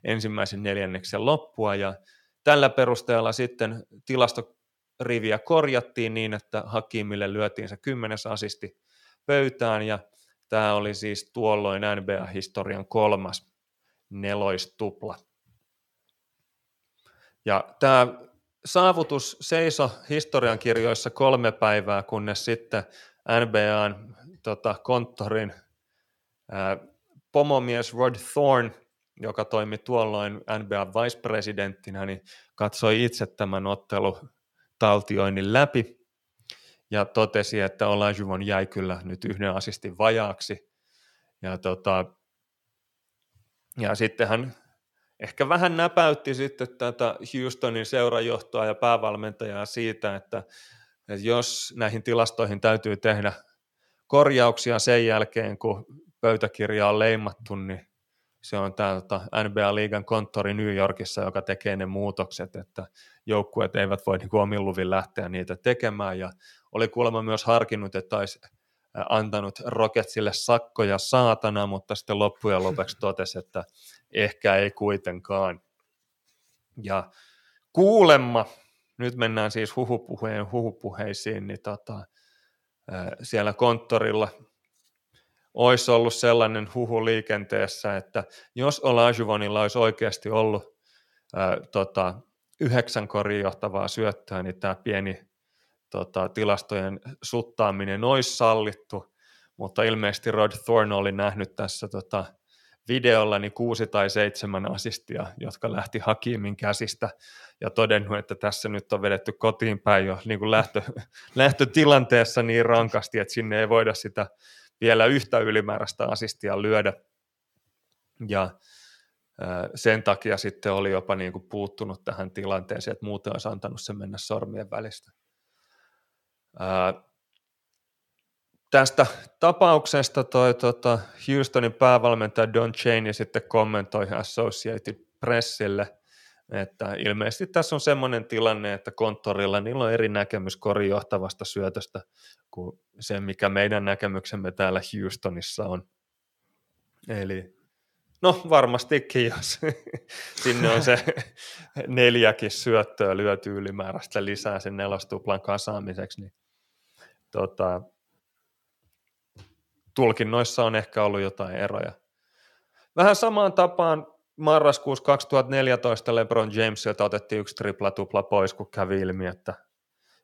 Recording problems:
none

